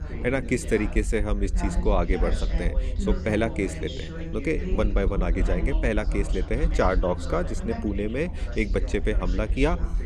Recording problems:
background chatter; loud; throughout; 3 voices, 9 dB below the speech
low rumble; faint; throughout; 25 dB below the speech

